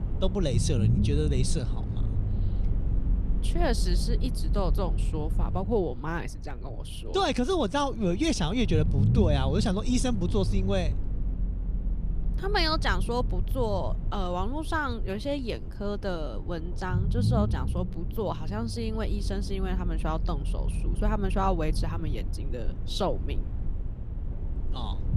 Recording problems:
low rumble; noticeable; throughout; 15 dB below the speech

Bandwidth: 15 kHz